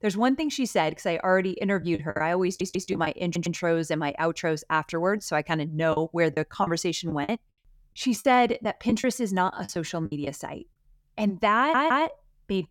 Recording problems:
choppy; very; from 2 to 3 s and from 6 to 10 s; 11% of the speech affected
audio stuttering; at 2.5 s, at 3.5 s and at 12 s

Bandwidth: 17.5 kHz